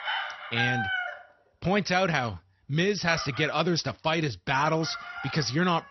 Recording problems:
garbled, watery; slightly; nothing above 6 kHz
animal sounds; loud; throughout; 7 dB below the speech

